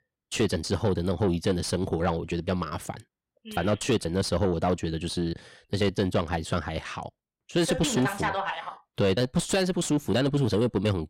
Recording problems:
distortion; slight; 10 dB below the speech

